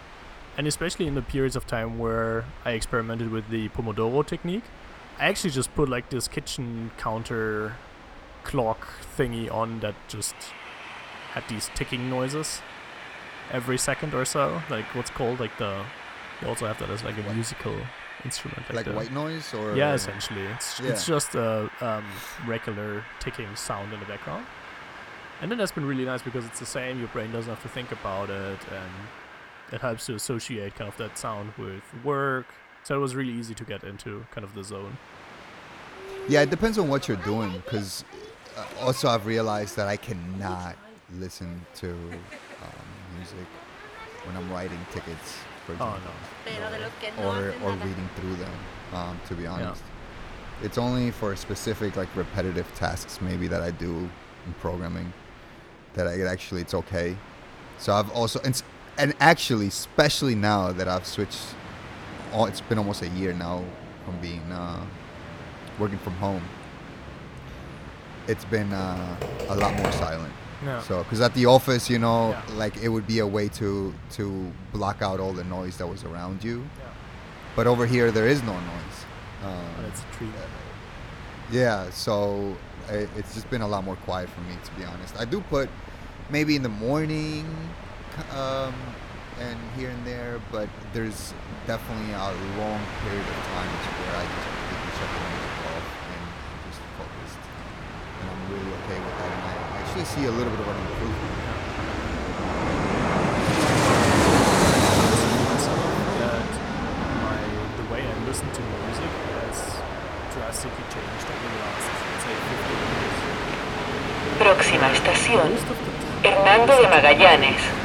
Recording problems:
train or aircraft noise; very loud; throughout; 4 dB above the speech
keyboard typing; loud; from 1:09 to 1:10; peak 2 dB above the speech

